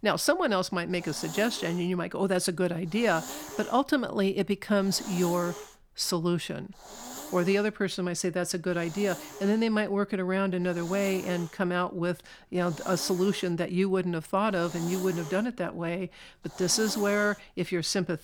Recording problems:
hiss; noticeable; throughout; 15 dB below the speech

